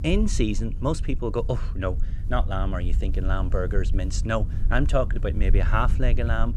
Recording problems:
wind noise on the microphone; occasional gusts; 15 dB below the speech

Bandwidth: 13.5 kHz